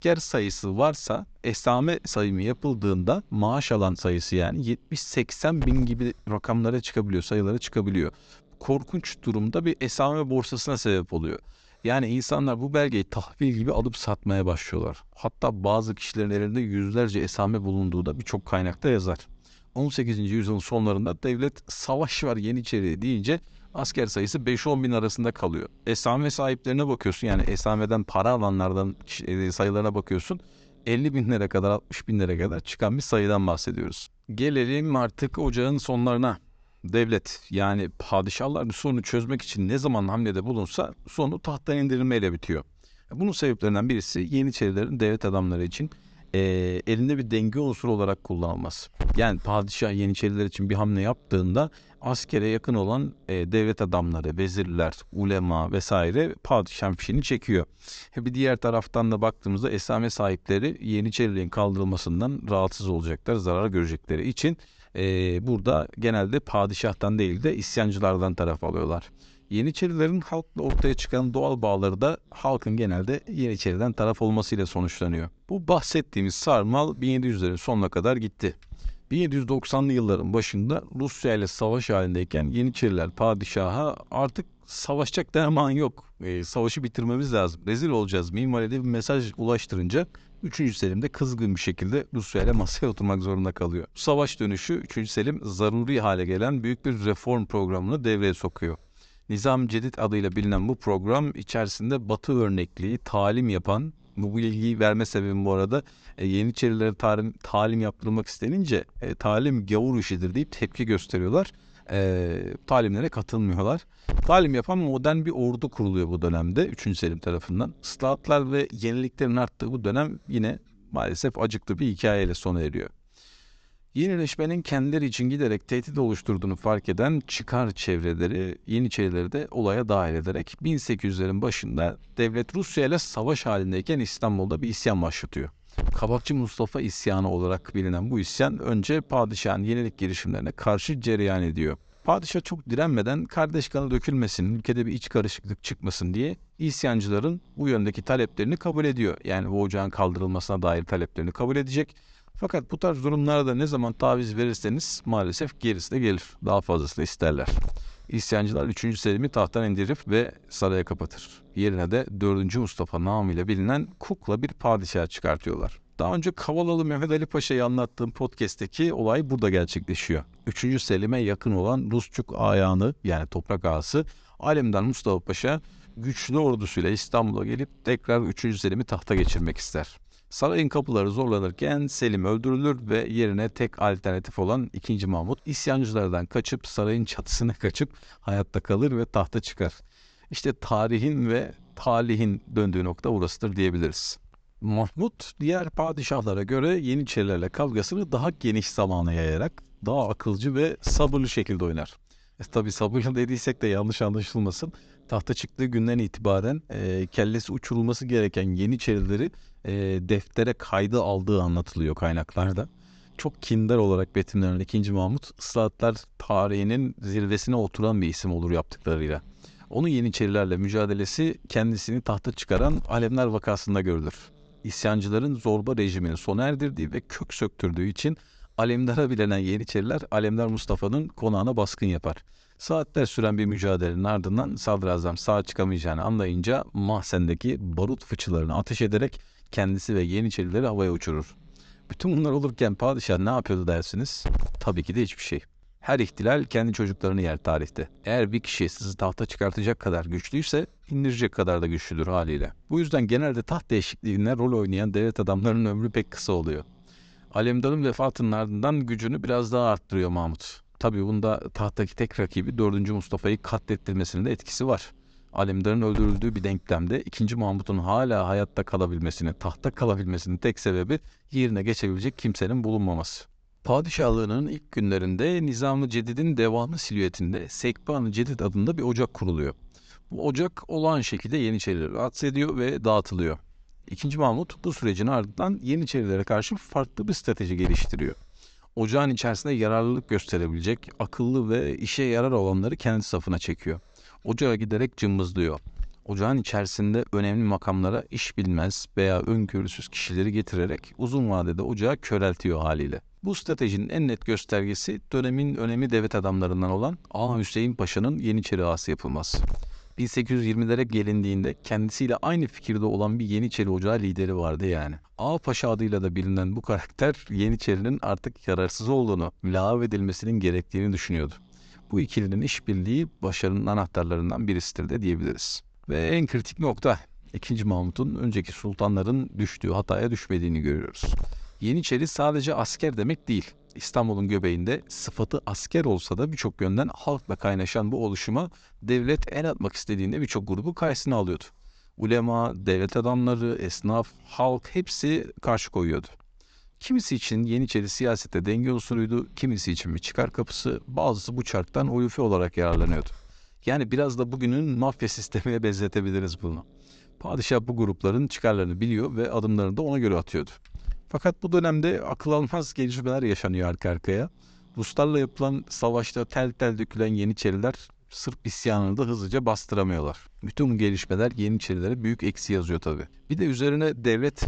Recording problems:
high frequencies cut off; noticeable; nothing above 8 kHz
hiss; noticeable; throughout; 15 dB below the speech

